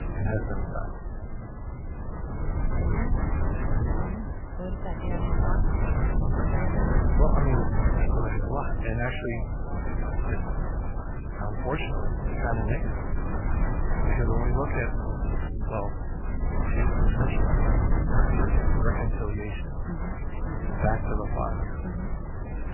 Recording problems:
garbled, watery; badly; nothing above 3 kHz
wind noise on the microphone; heavy; 1 dB below the speech
rain or running water; noticeable; throughout; 15 dB below the speech

